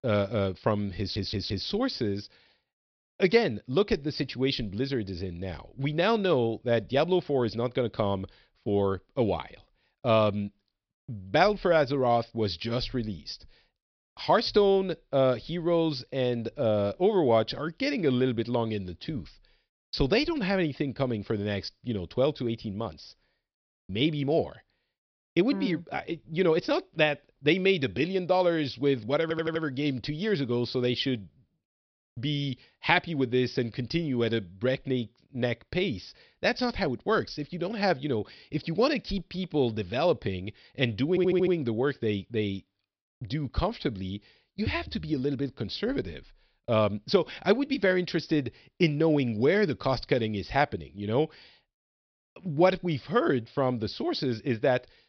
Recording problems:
high frequencies cut off; noticeable; nothing above 5.5 kHz
audio stuttering; at 1 s, at 29 s and at 41 s

